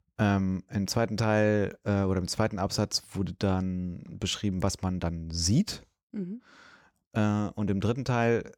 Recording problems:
none

